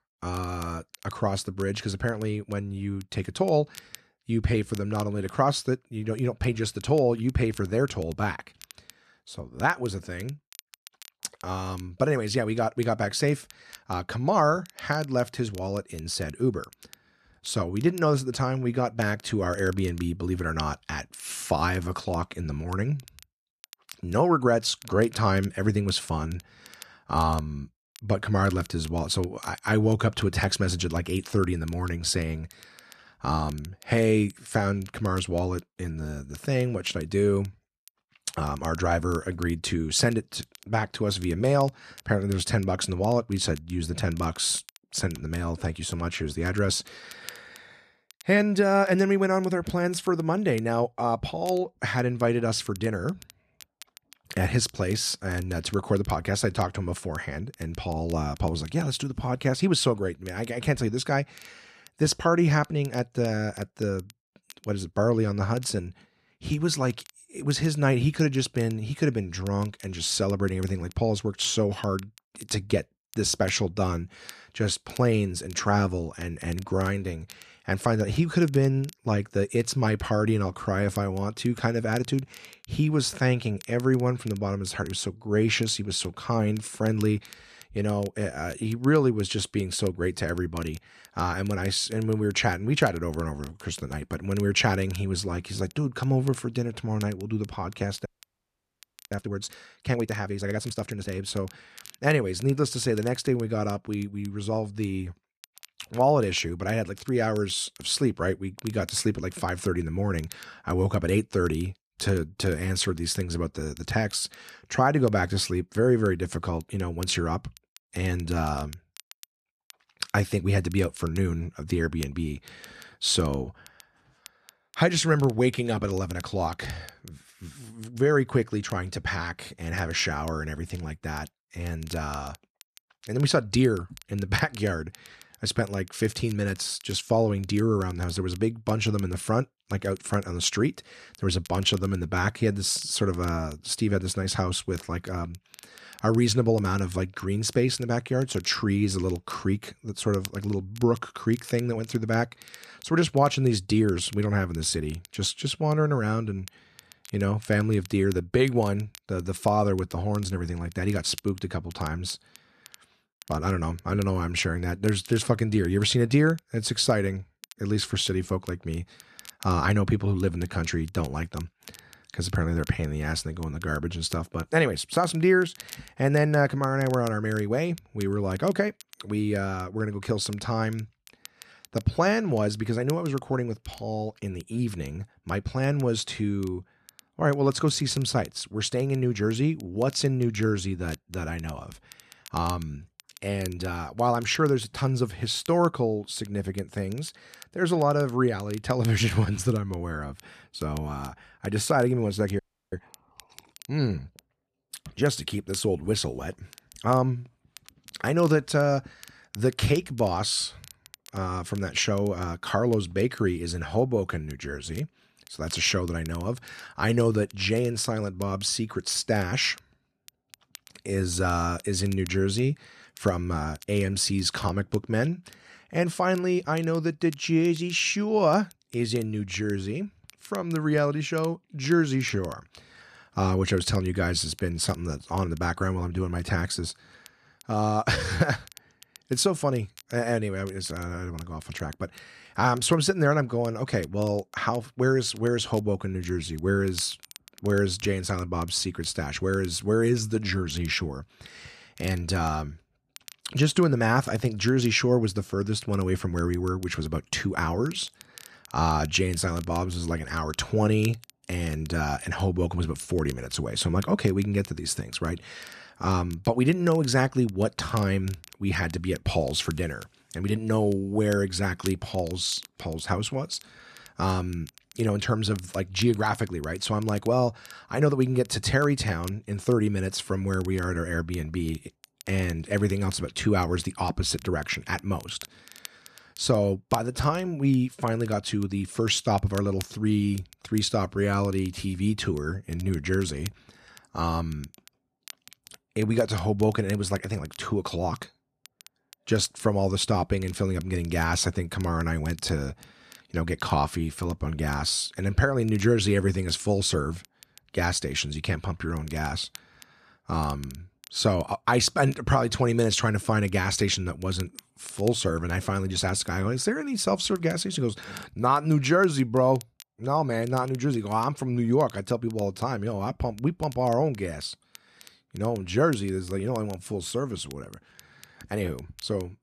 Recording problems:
crackle, like an old record; faint; 25 dB below the speech
audio freezing; at 1:38 for 1 s and at 3:22

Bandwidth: 14 kHz